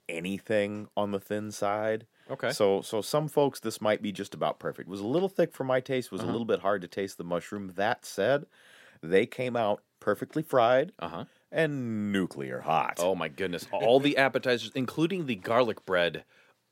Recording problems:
none

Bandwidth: 16 kHz